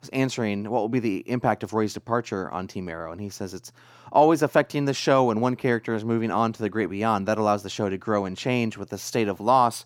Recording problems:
none

